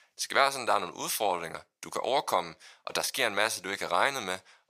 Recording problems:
thin; very; fading below 700 Hz

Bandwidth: 15 kHz